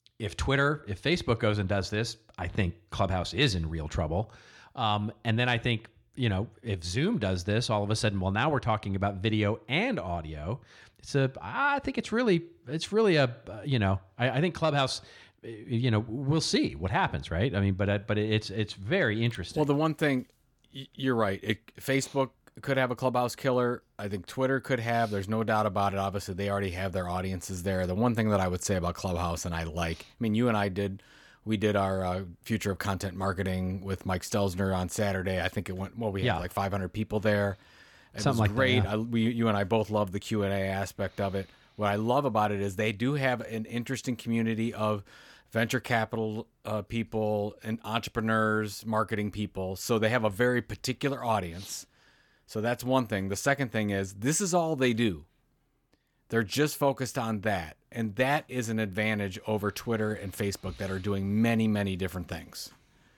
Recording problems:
none

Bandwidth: 18 kHz